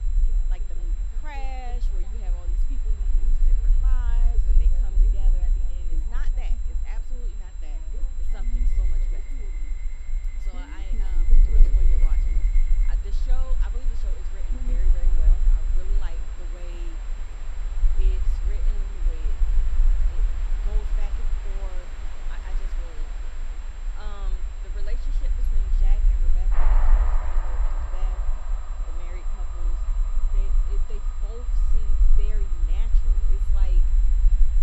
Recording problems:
train or aircraft noise; very loud; throughout; 1 dB above the speech
high-pitched whine; loud; throughout; 7.5 kHz, 8 dB below the speech
low rumble; loud; throughout; 5 dB below the speech
wind noise on the microphone; occasional gusts; 25 dB below the speech
background chatter; faint; throughout; 2 voices, 25 dB below the speech

